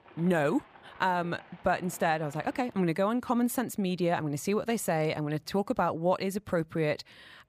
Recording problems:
animal sounds; faint; until 3 s; 25 dB below the speech

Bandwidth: 15 kHz